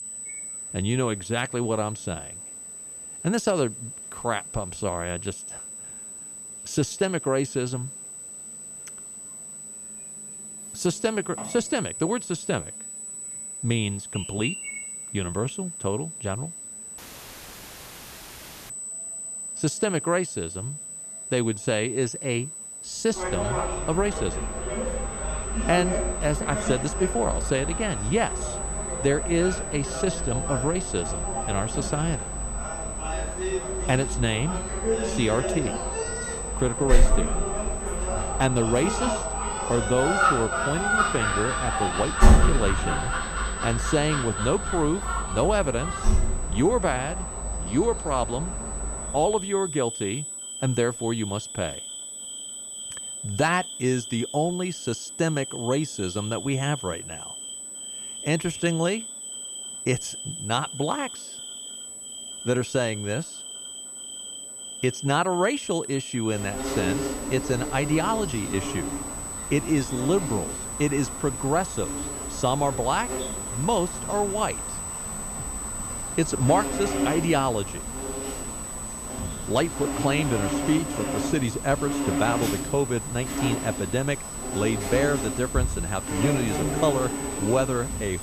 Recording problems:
high-pitched whine; loud; throughout; 8 kHz, 7 dB below the speech
animal sounds; loud; throughout; 4 dB below the speech
audio cutting out; filled with static; at 17 s for 1.5 s

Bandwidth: 14.5 kHz